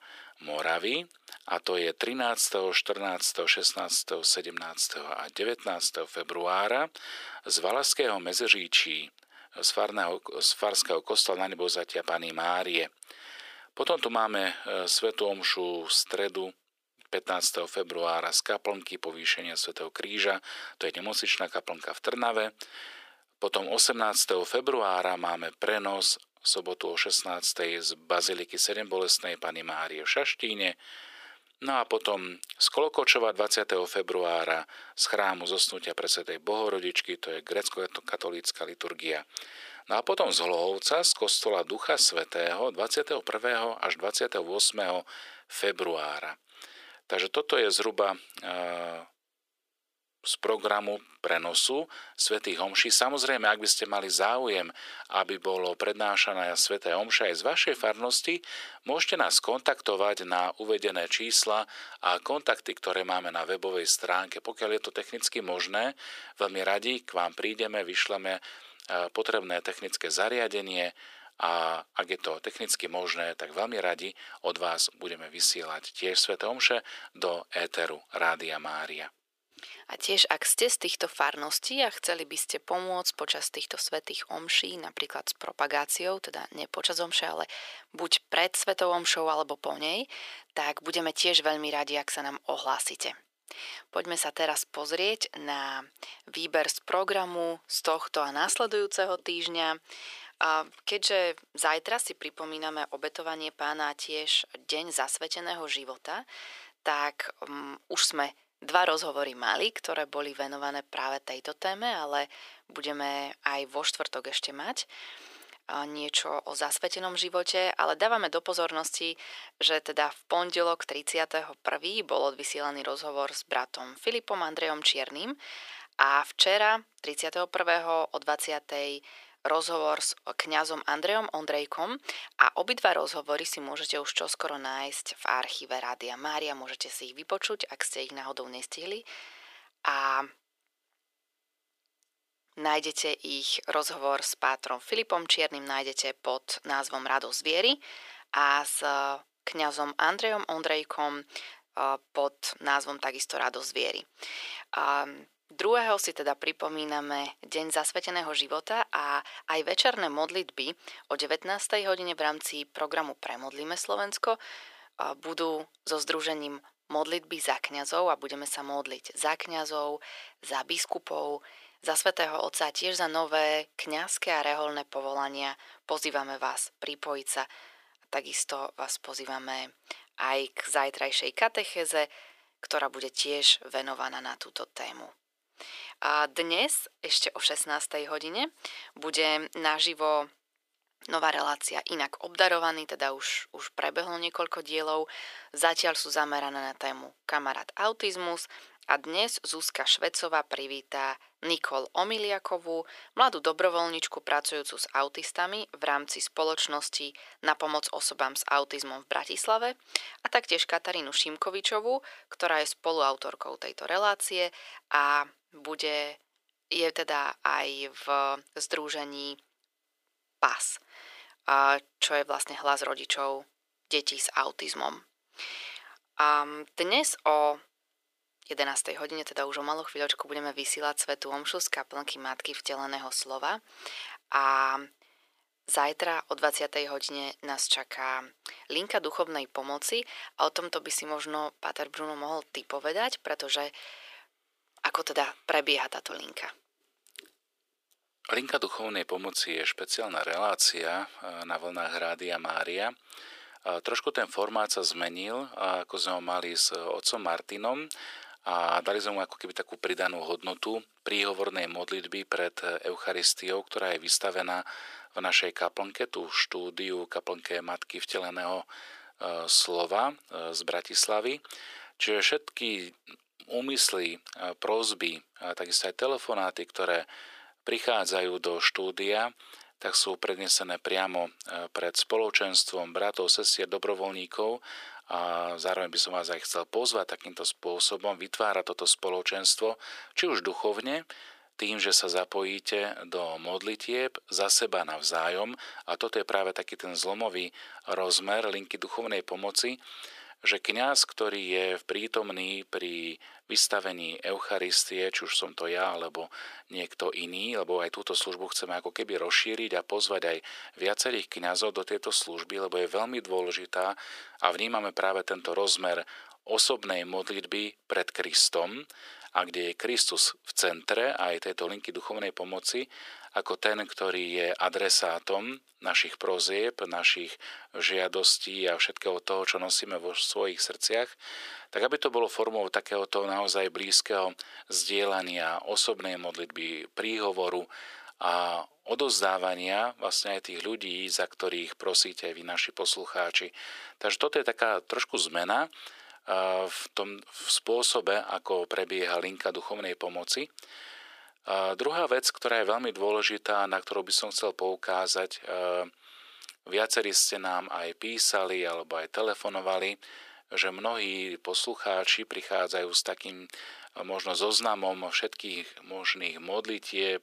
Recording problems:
thin; very; fading below 450 Hz

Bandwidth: 15 kHz